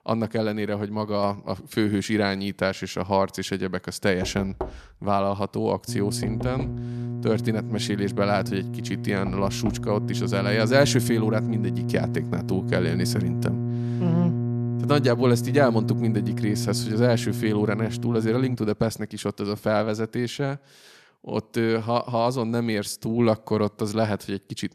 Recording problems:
electrical hum; loud; from 6 to 19 s; 60 Hz, 10 dB below the speech
door banging; noticeable; from 4 to 10 s; peak 9 dB below the speech

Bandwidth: 13.5 kHz